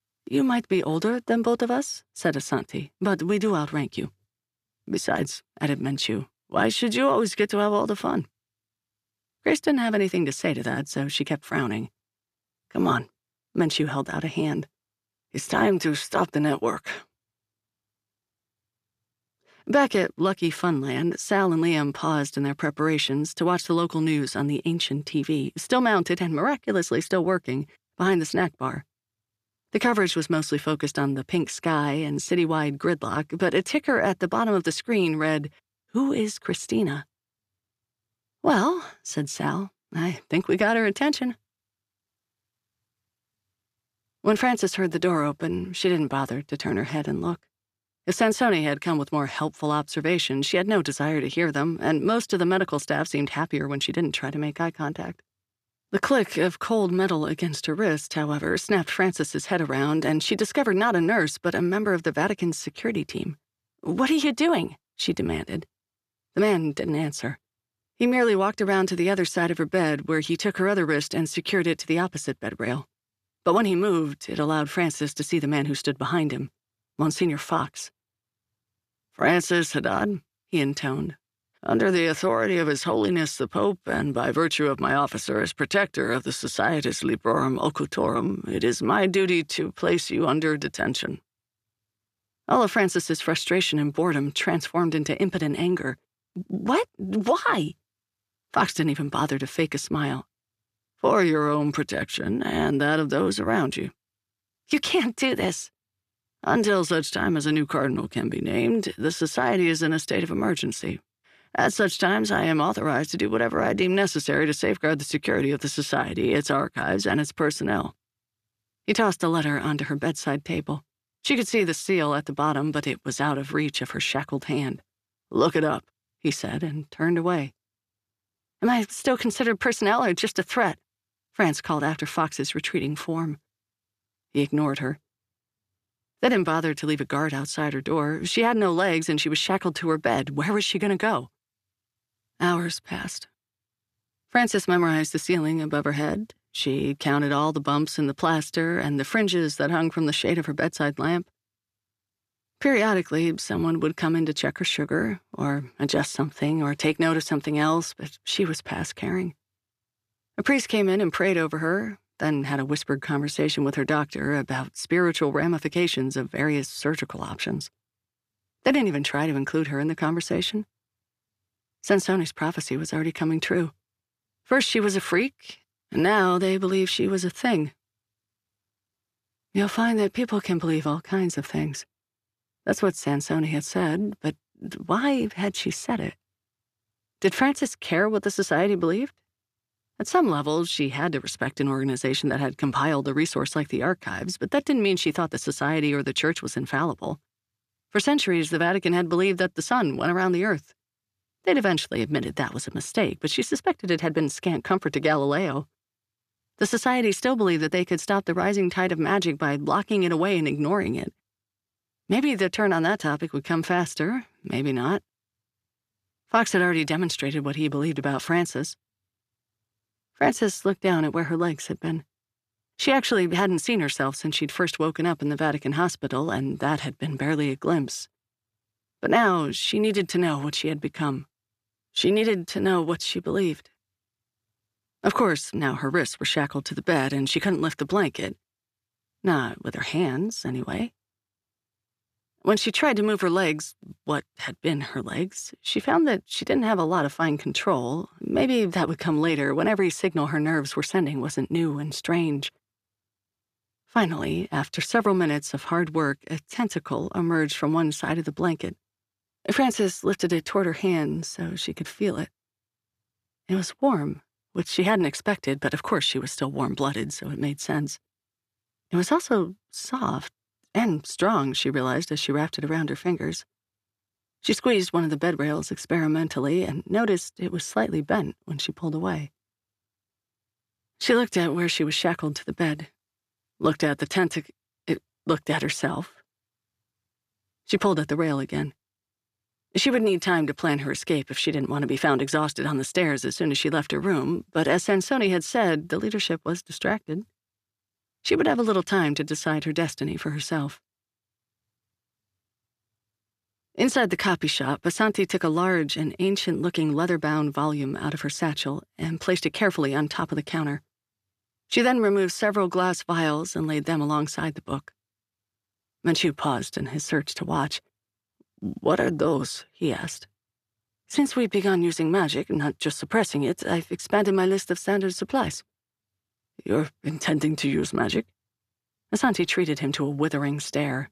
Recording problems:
none

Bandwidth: 14.5 kHz